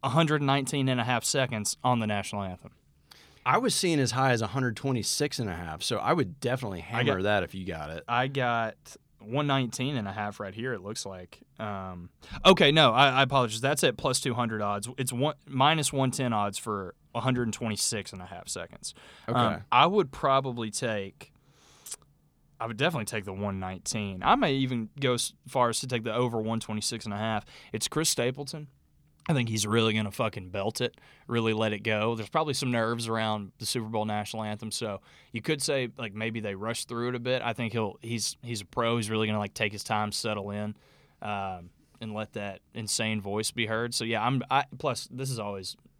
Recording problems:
none

